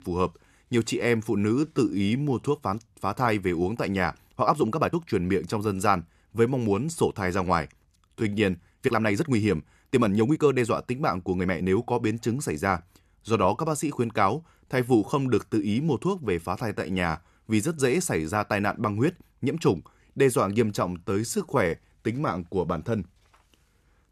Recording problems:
uneven, jittery; strongly; from 1 to 22 s

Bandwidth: 13.5 kHz